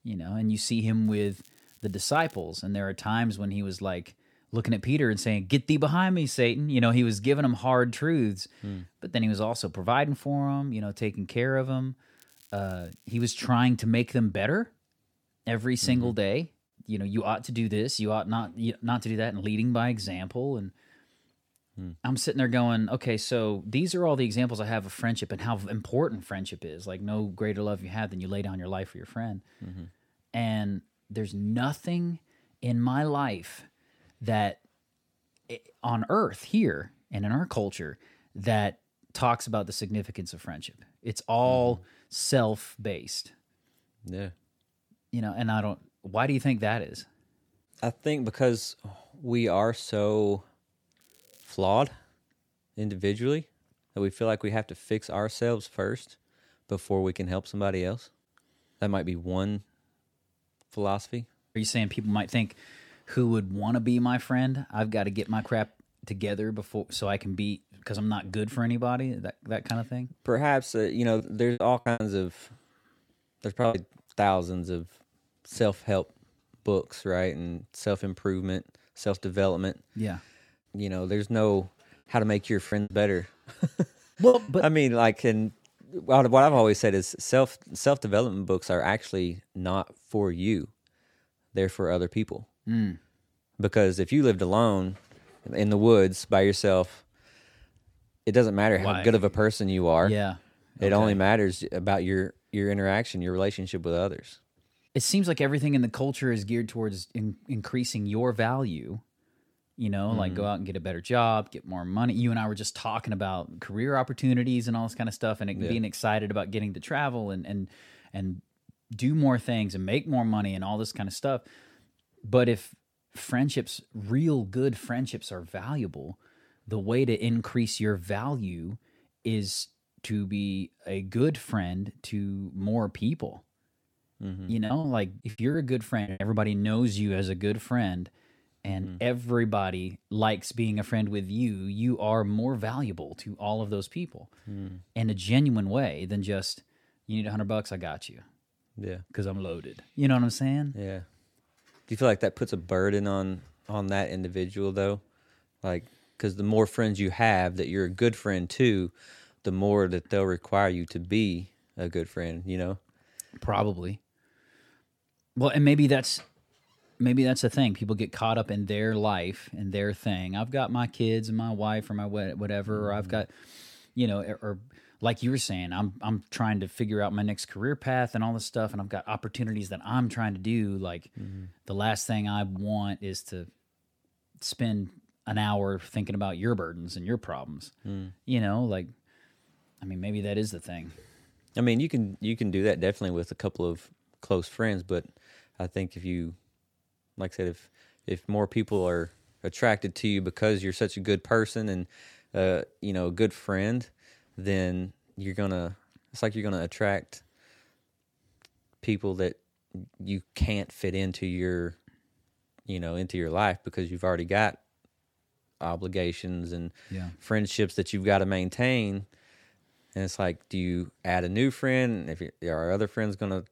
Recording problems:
crackling; faint; from 1 to 2.5 s, from 12 to 13 s and at 51 s; 30 dB below the speech
choppy; very; from 1:11 to 1:14, from 1:23 to 1:24 and from 2:15 to 2:16; 14% of the speech affected

